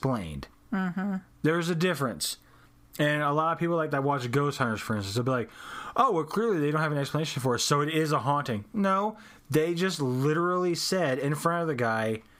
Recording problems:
squashed, flat; heavily

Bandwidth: 15.5 kHz